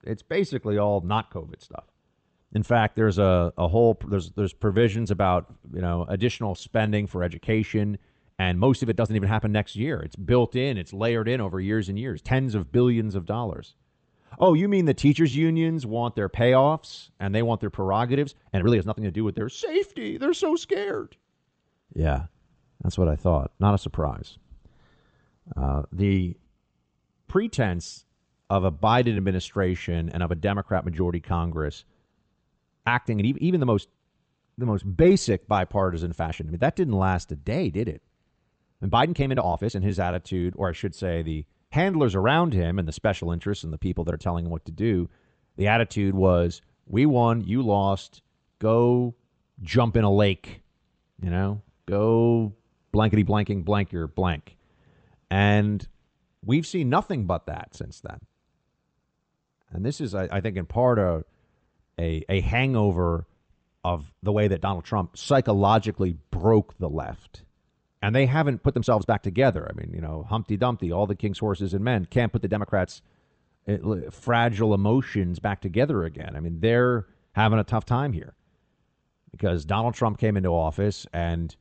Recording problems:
high frequencies cut off; noticeable; nothing above 8 kHz
uneven, jittery; strongly; from 4.5 s to 1:17

